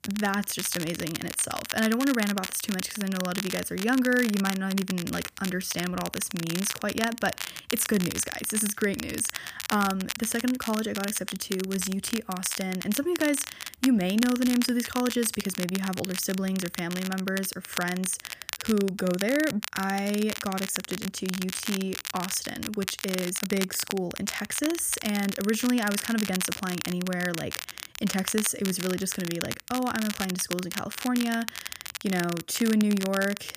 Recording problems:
crackle, like an old record; loud; 7 dB below the speech

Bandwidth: 15 kHz